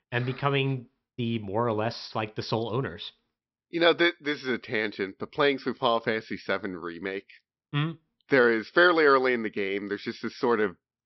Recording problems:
high frequencies cut off; noticeable; nothing above 5.5 kHz

